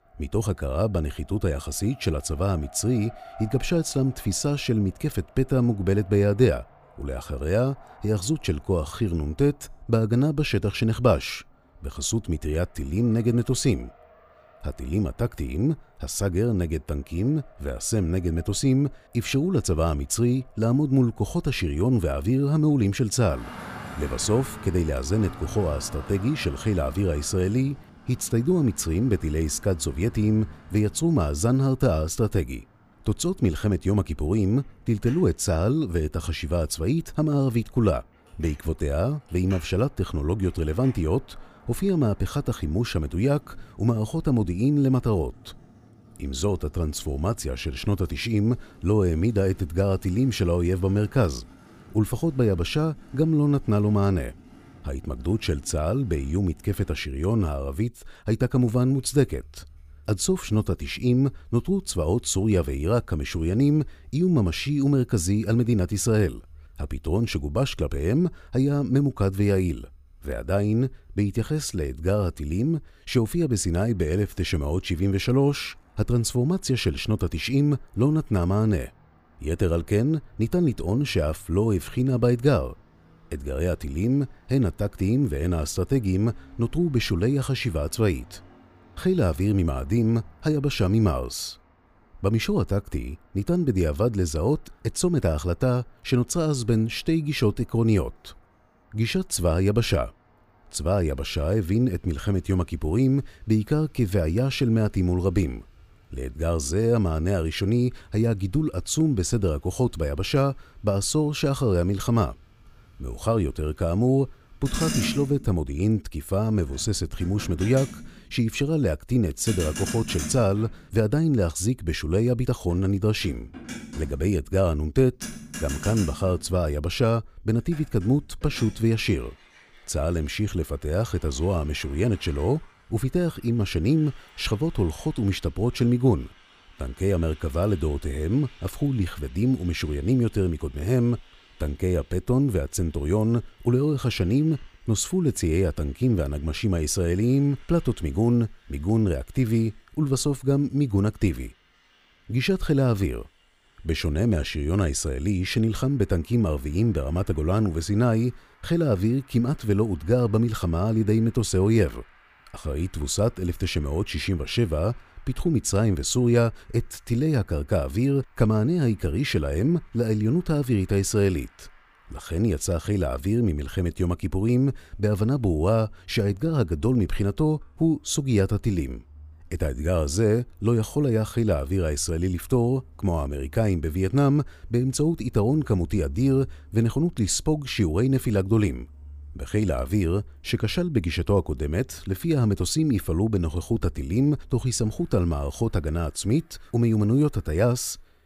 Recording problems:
traffic noise; faint; throughout; 20 dB below the speech

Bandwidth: 15 kHz